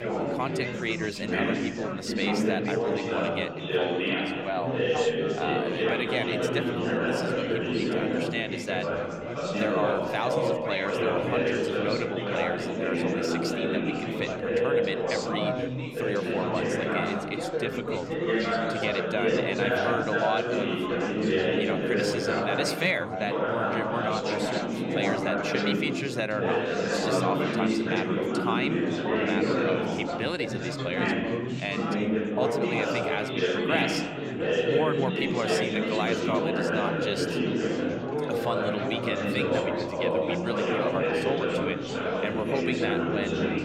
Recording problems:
chatter from many people; very loud; throughout; 5 dB above the speech

